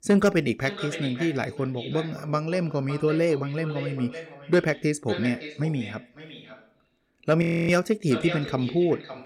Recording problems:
echo of what is said; strong; throughout; 560 ms later, 10 dB below the speech
audio freezing; at 7.5 s

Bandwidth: 17 kHz